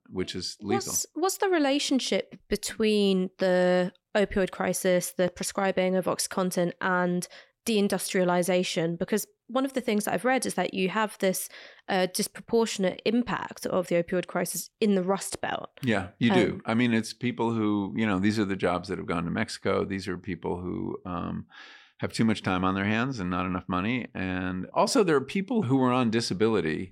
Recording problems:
none

